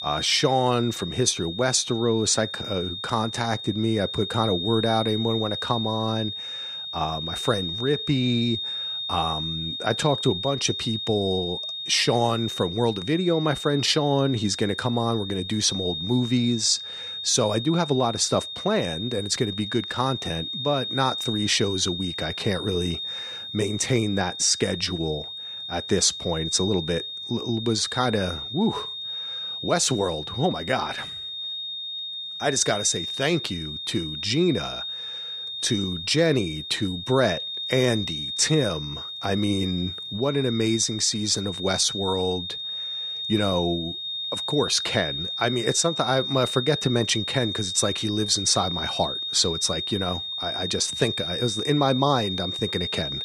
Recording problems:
high-pitched whine; loud; throughout; 3.5 kHz, 5 dB below the speech

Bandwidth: 15 kHz